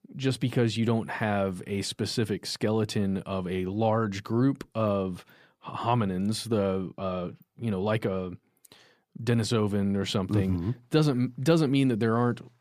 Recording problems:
none

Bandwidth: 15 kHz